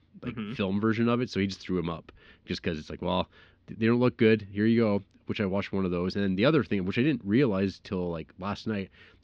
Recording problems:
muffled; very slightly; fading above 4.5 kHz

